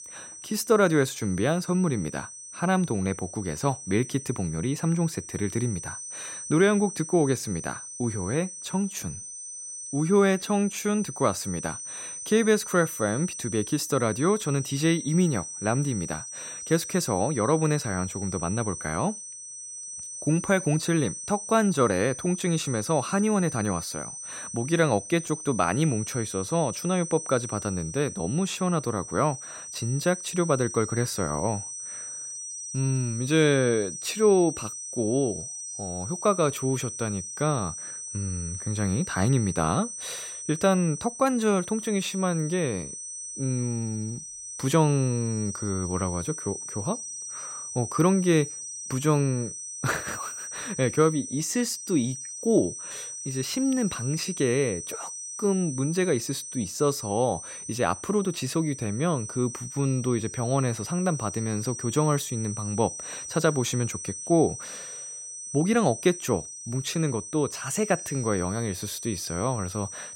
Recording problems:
high-pitched whine; loud; throughout; 6 kHz, 8 dB below the speech

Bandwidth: 16 kHz